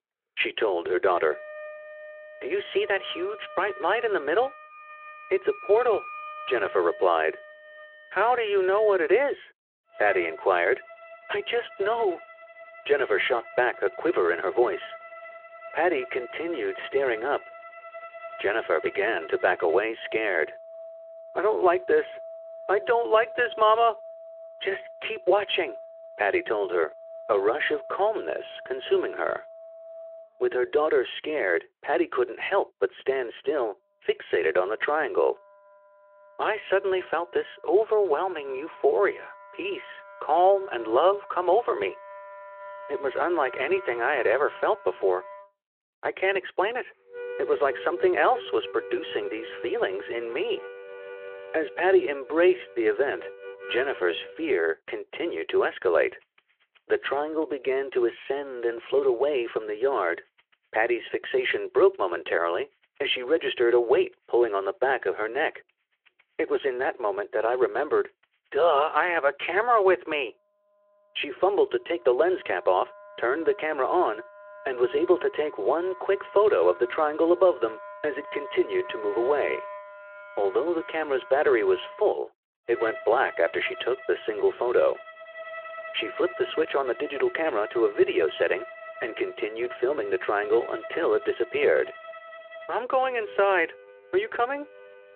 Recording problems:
phone-call audio
background music; noticeable; throughout; 15 dB below the speech

